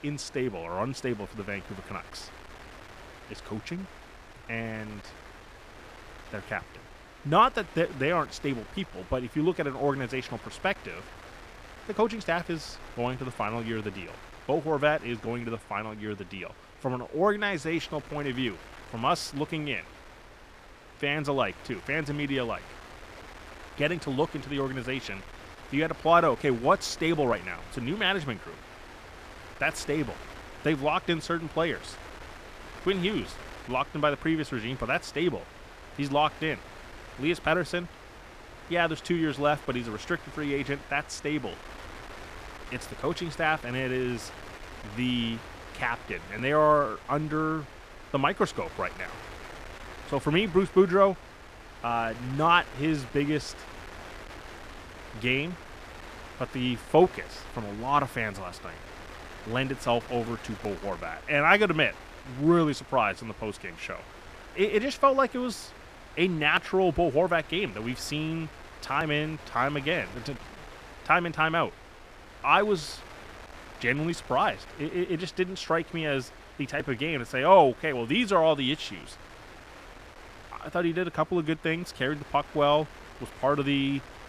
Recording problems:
wind noise on the microphone; occasional gusts; 20 dB below the speech

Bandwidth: 14.5 kHz